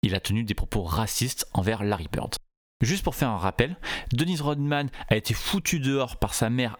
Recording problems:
squashed, flat; somewhat

